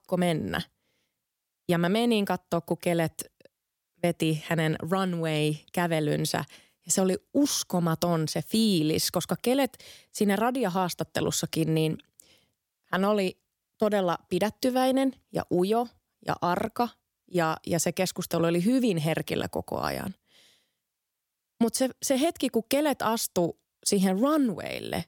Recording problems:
none

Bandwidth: 17.5 kHz